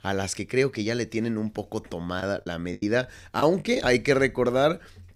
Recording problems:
choppy; very; from 2 to 4 s; 9% of the speech affected

